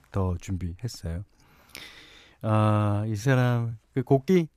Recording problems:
uneven, jittery; strongly

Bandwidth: 14.5 kHz